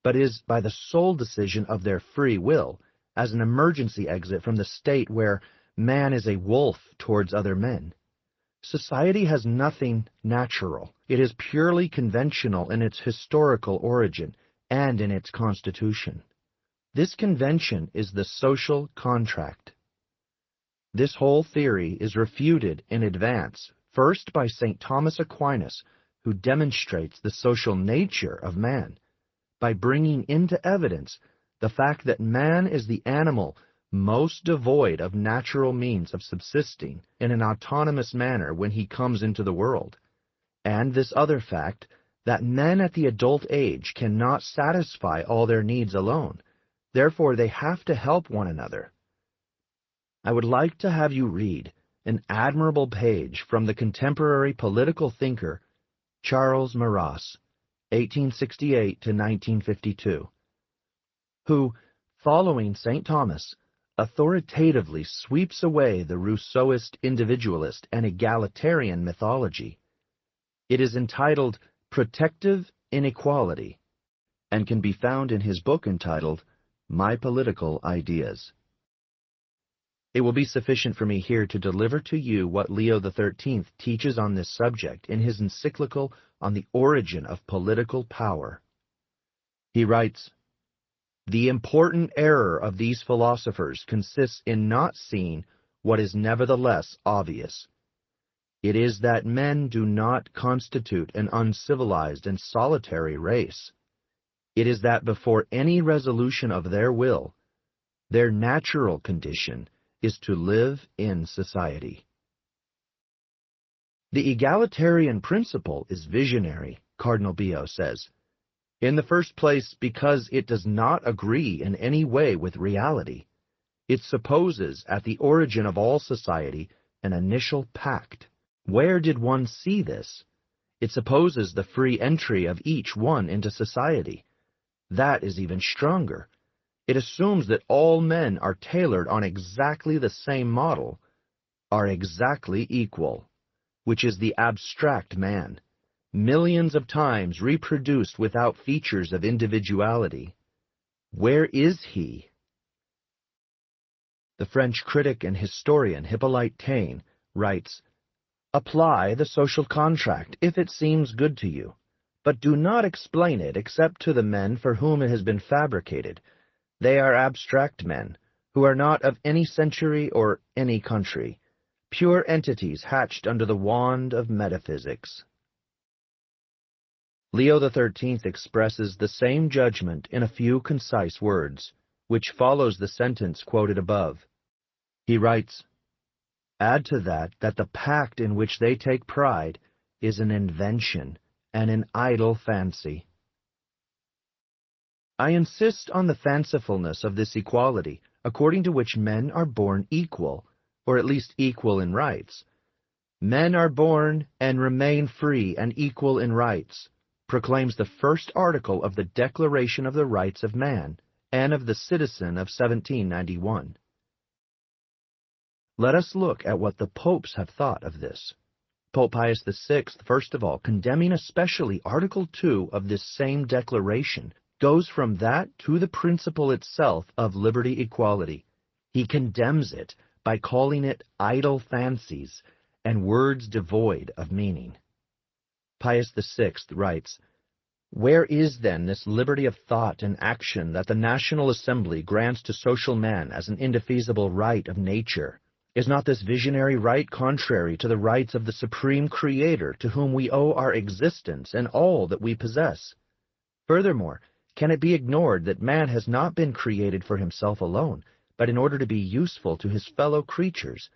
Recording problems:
garbled, watery; slightly; nothing above 6 kHz

